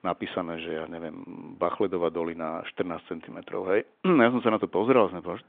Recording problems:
phone-call audio

